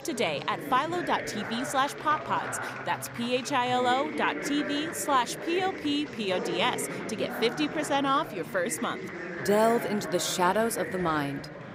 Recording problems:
chatter from many people; loud; throughout; 8 dB below the speech

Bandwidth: 15.5 kHz